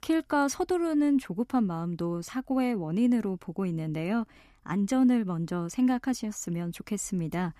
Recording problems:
none

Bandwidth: 14.5 kHz